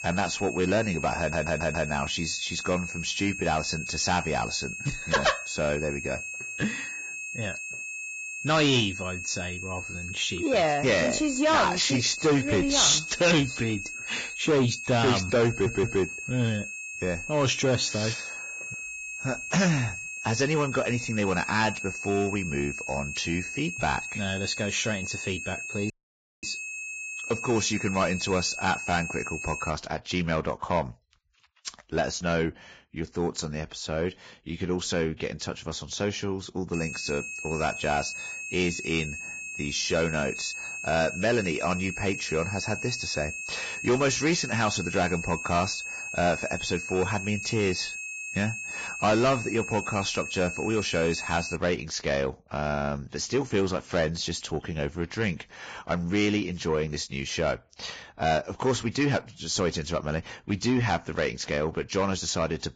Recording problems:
distortion; heavy; 8 dB below the speech
garbled, watery; badly; nothing above 7.5 kHz
high-pitched whine; loud; until 30 s and from 37 to 52 s; 2.5 kHz, 7 dB below the speech
audio stuttering; at 1 s and at 15 s
audio cutting out; at 26 s for 0.5 s

